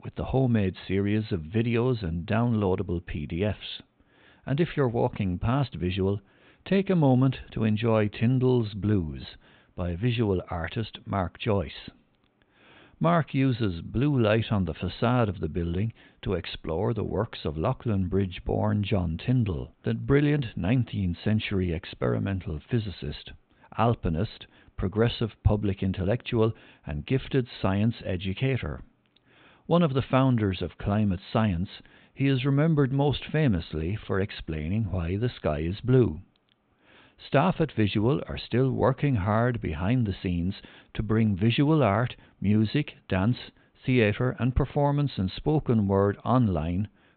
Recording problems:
high frequencies cut off; severe; nothing above 4 kHz

